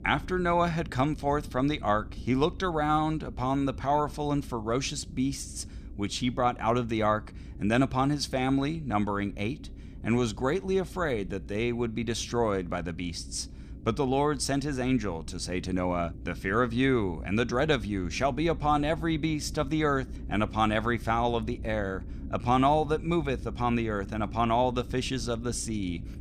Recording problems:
low rumble; faint; throughout; 25 dB below the speech

